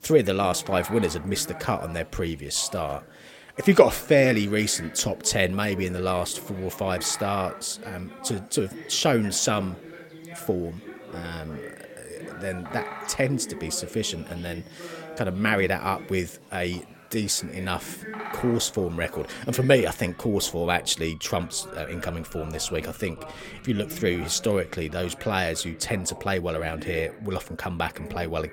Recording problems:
animal sounds; noticeable; throughout; 20 dB below the speech
background chatter; noticeable; throughout; 3 voices, 15 dB below the speech

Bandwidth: 16.5 kHz